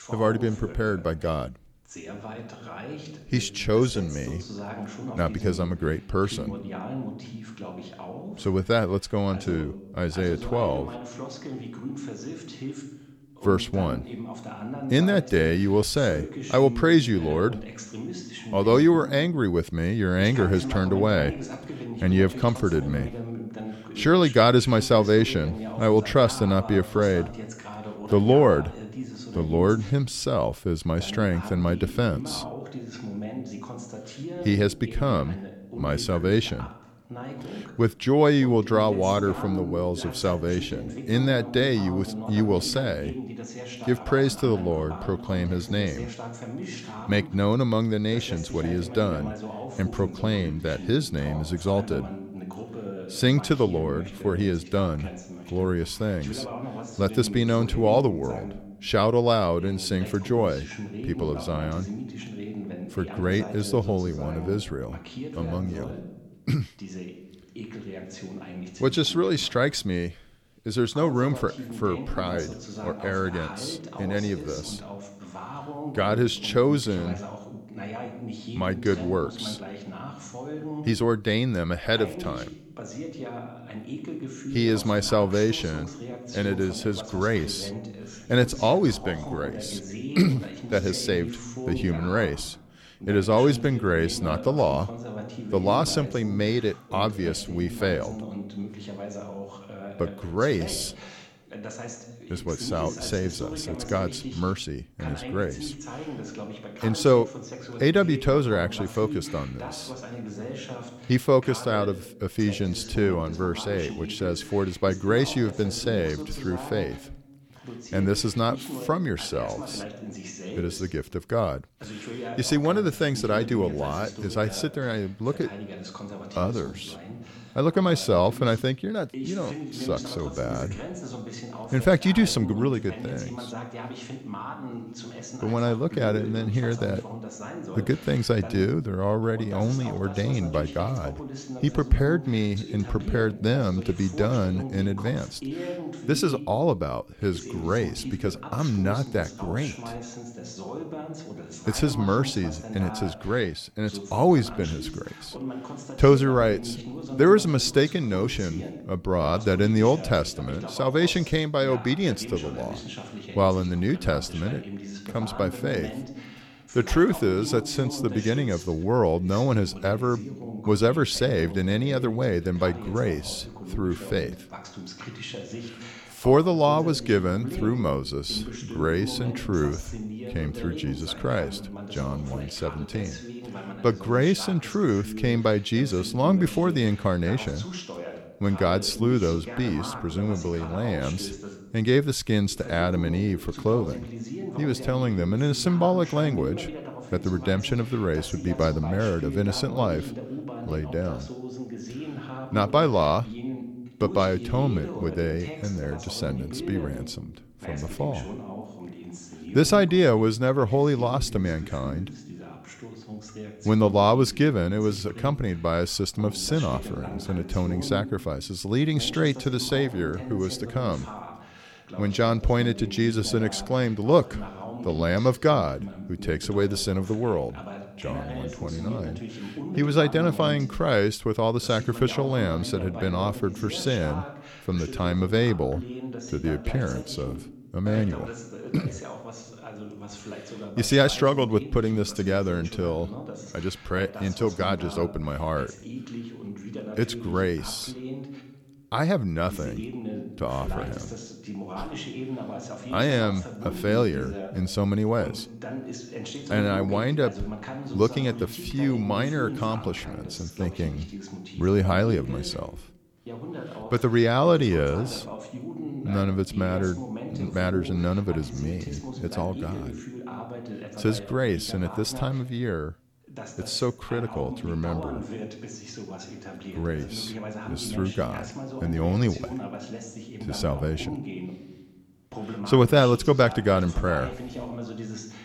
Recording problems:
voice in the background; noticeable; throughout; 10 dB below the speech

